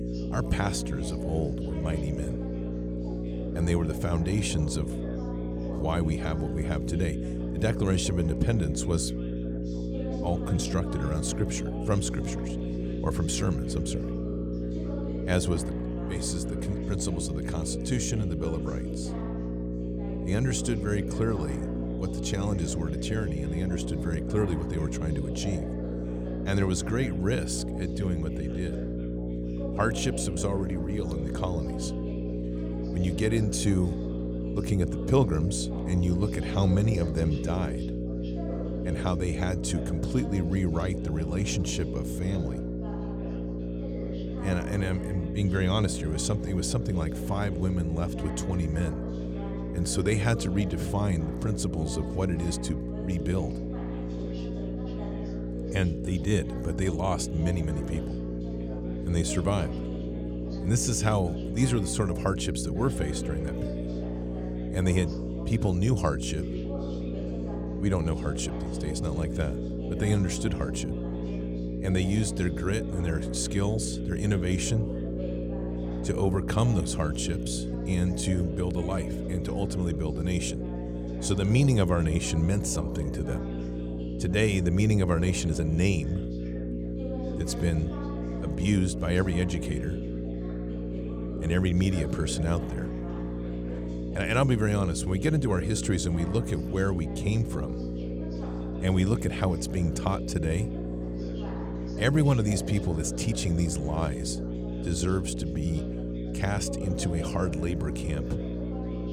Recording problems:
electrical hum; loud; throughout; 60 Hz, 5 dB below the speech
background chatter; noticeable; throughout; 3 voices, 15 dB below the speech

